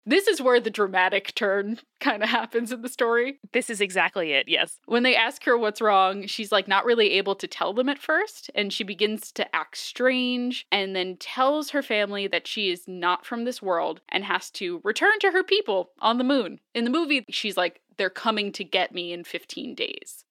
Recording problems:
thin; very slightly; fading below 250 Hz

